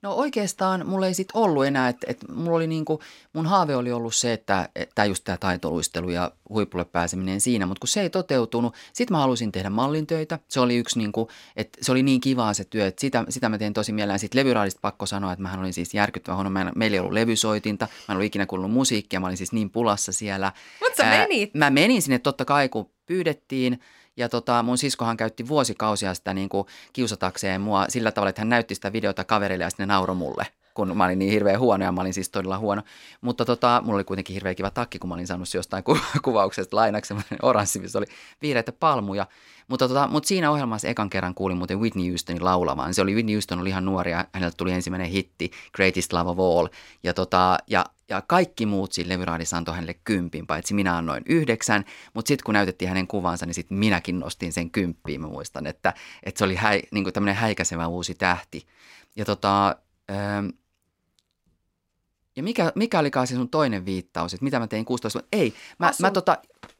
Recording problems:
none

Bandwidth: 16 kHz